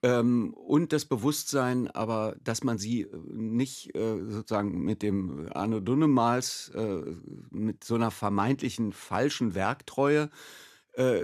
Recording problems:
abrupt cut into speech; at the end

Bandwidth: 13.5 kHz